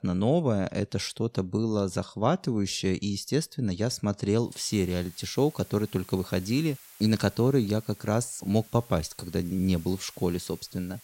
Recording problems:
hiss; faint; from 4.5 s on; 20 dB below the speech

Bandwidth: 16 kHz